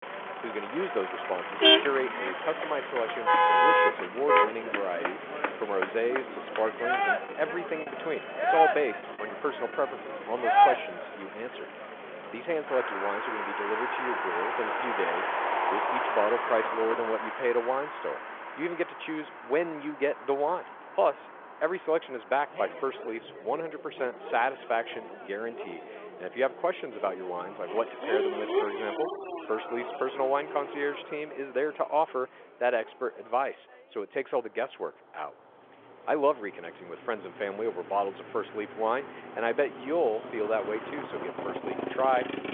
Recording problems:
phone-call audio; nothing above 3.5 kHz
traffic noise; very loud; throughout; 3 dB above the speech
choppy; occasionally; from 8 to 9 s; 3% of the speech affected

